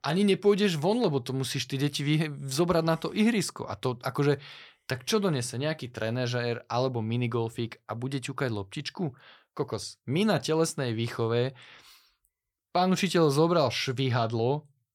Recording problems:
none

